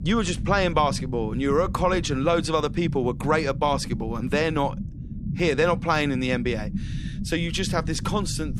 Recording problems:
low rumble; noticeable; throughout; 15 dB below the speech

